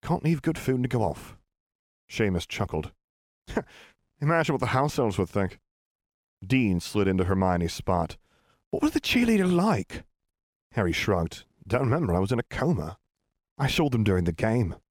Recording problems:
none

